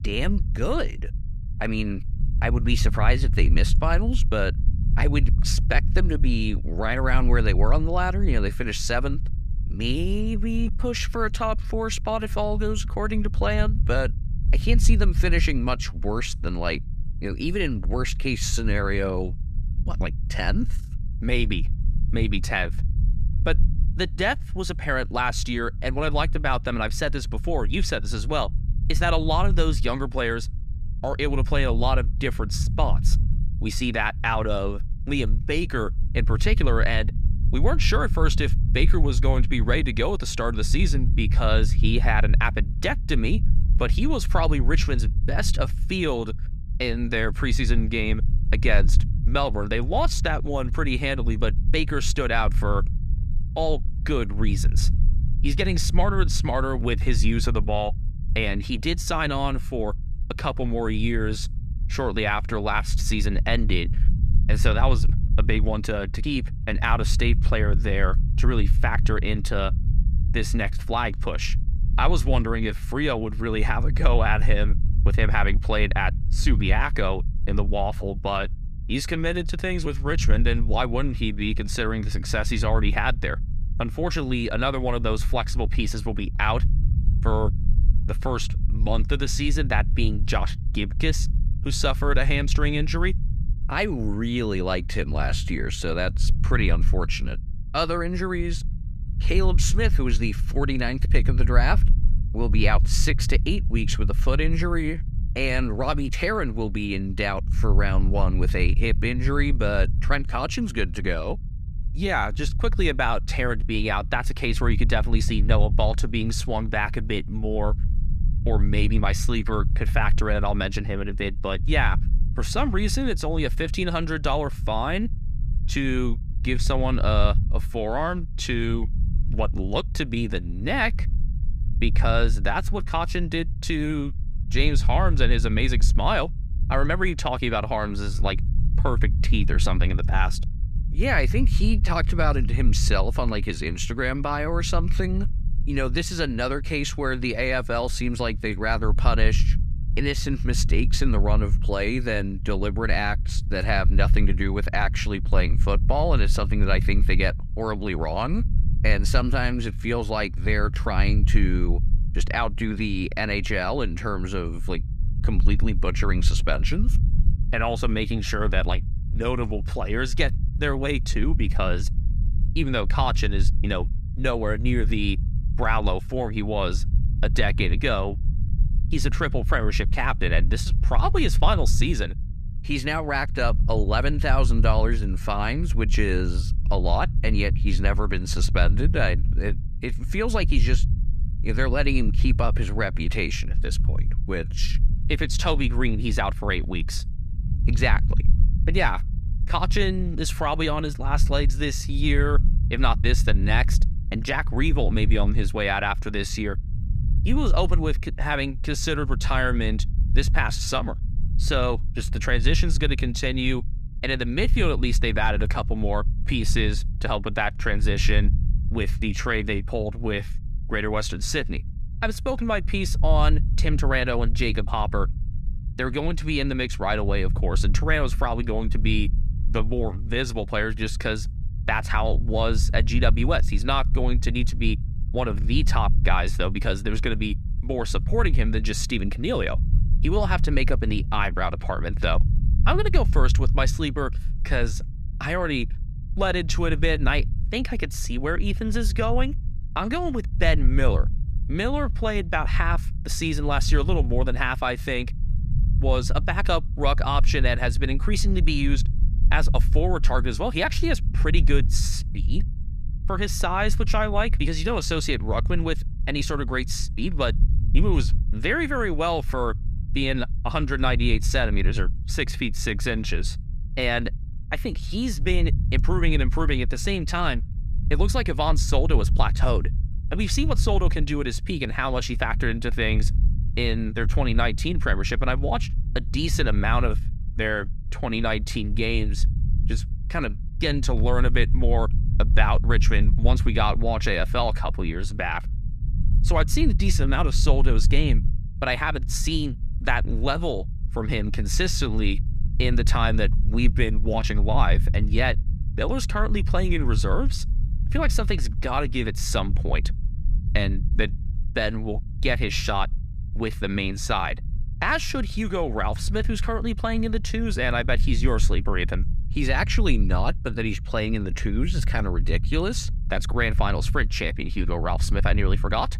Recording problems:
low rumble; noticeable; throughout; 15 dB below the speech

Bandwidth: 14.5 kHz